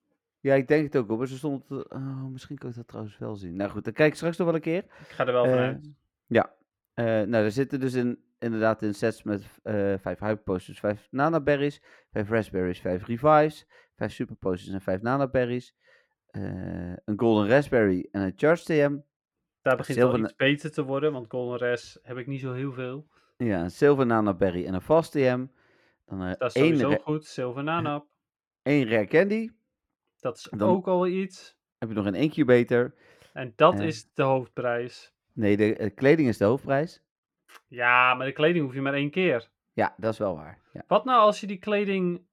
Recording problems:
muffled; slightly; fading above 3.5 kHz

